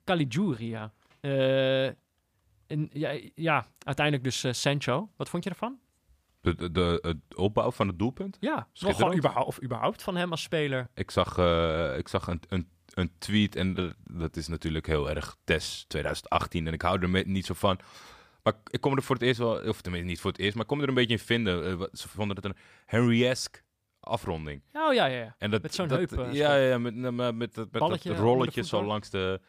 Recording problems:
none

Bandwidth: 15 kHz